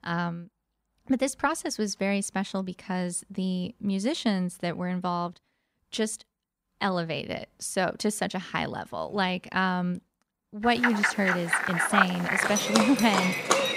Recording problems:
animal sounds; very loud; from 11 s on; 3 dB above the speech

